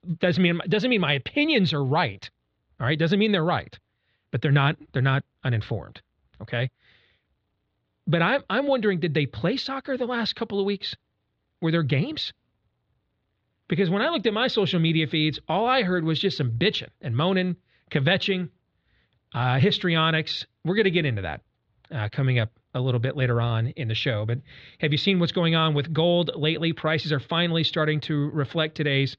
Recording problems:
muffled; slightly; fading above 4 kHz

